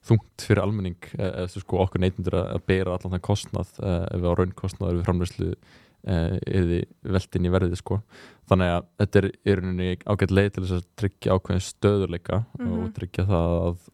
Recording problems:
none

